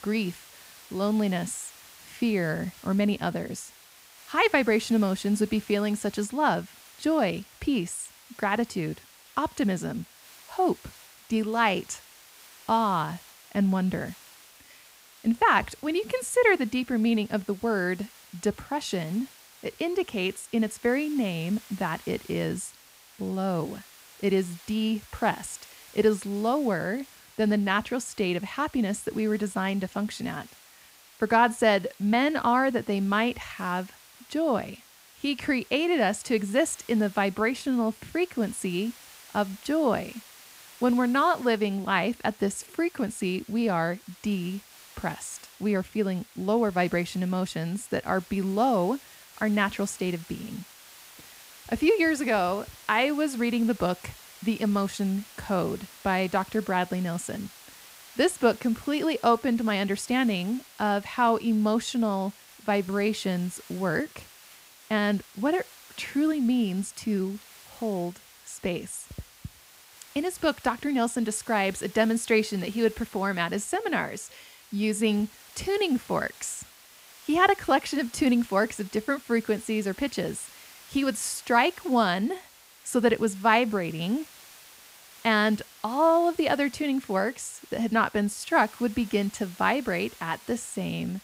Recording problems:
hiss; faint; throughout; 20 dB below the speech

